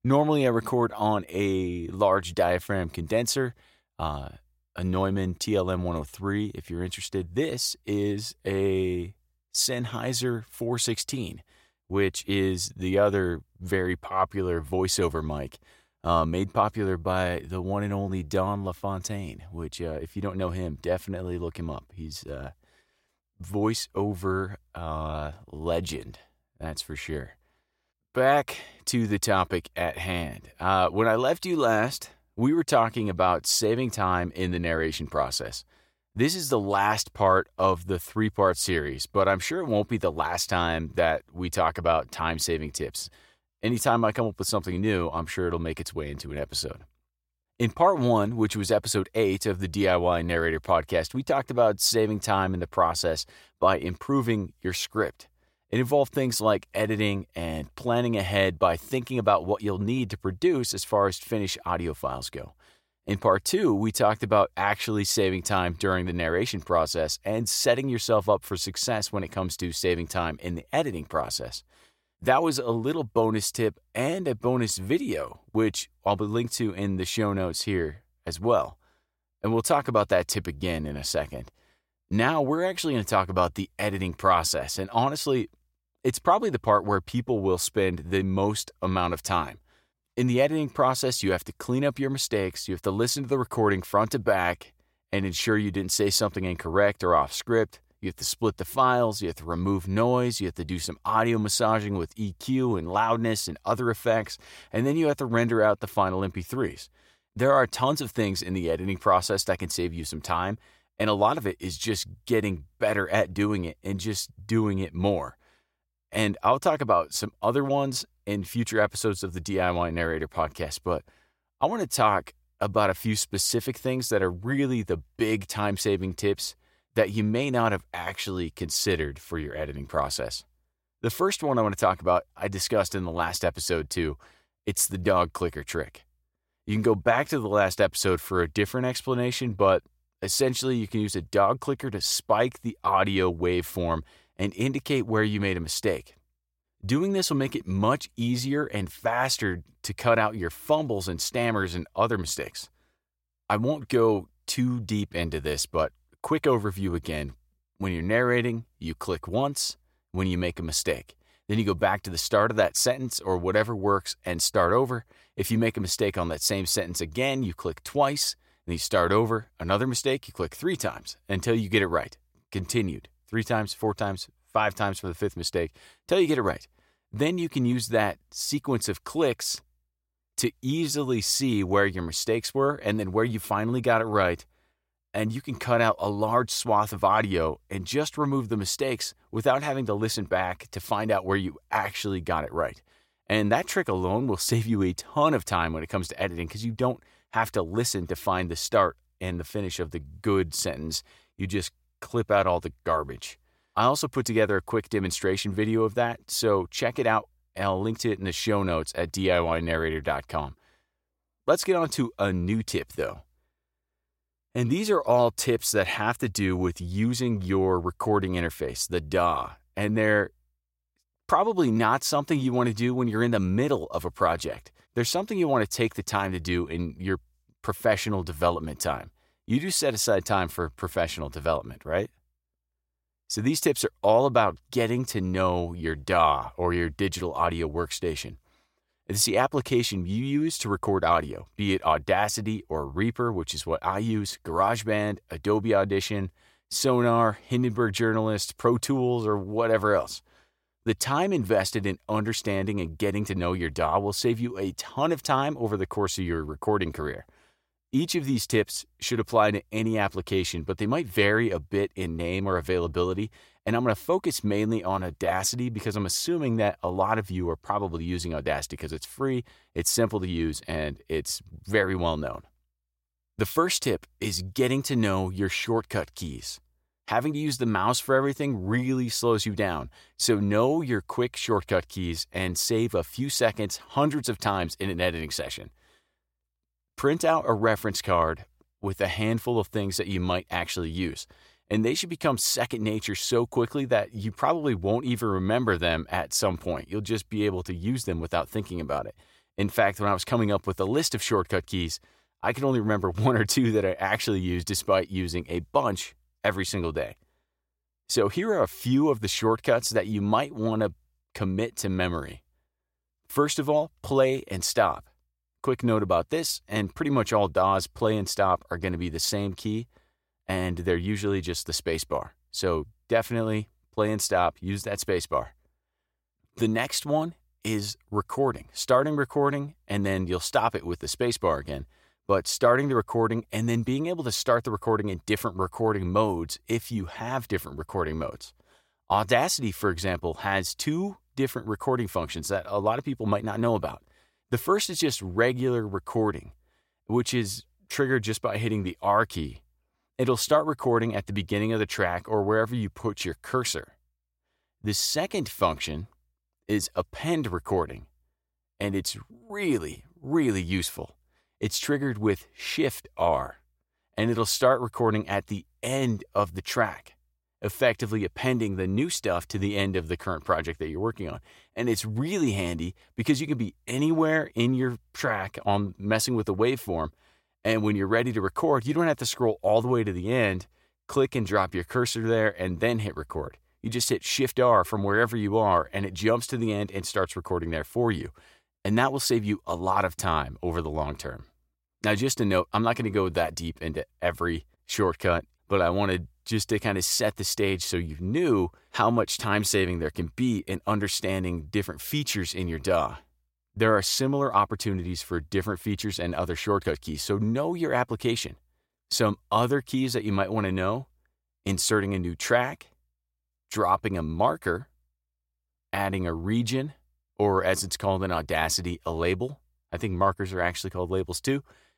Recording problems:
none

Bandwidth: 16.5 kHz